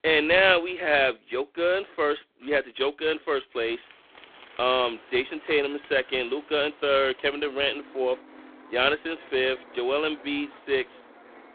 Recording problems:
phone-call audio; poor line
traffic noise; faint; from 4 s on; 25 dB below the speech

